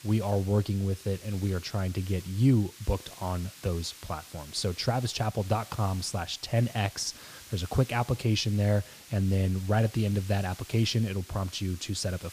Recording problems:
hiss; noticeable; throughout; 15 dB below the speech

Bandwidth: 15 kHz